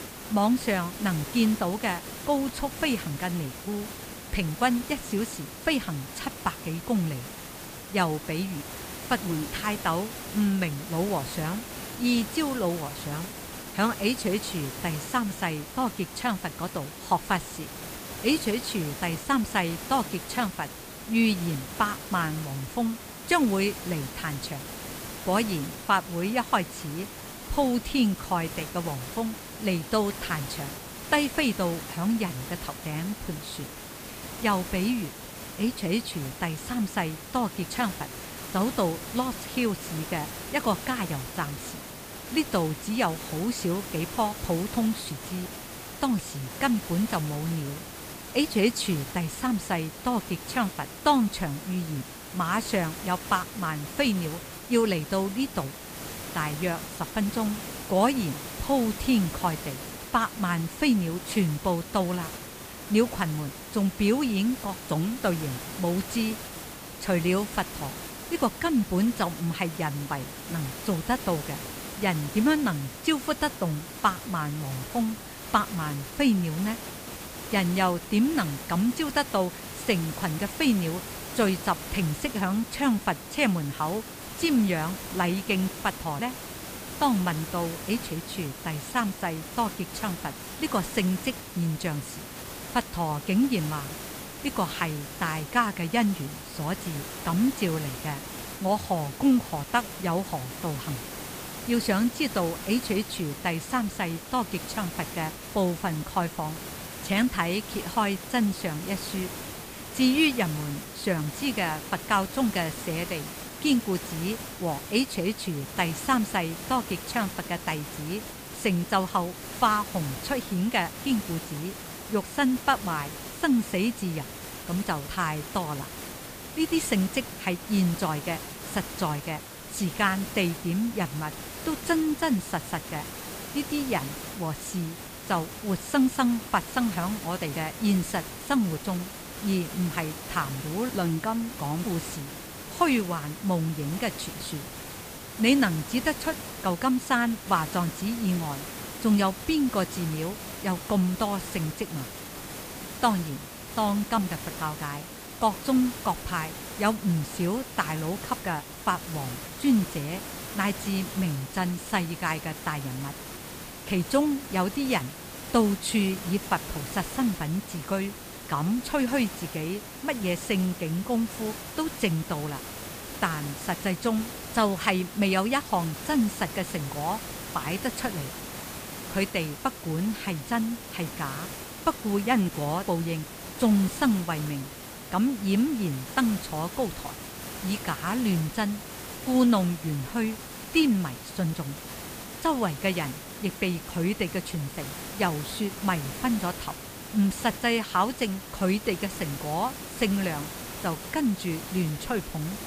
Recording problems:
hiss; loud; throughout; 9 dB below the speech

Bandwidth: 15 kHz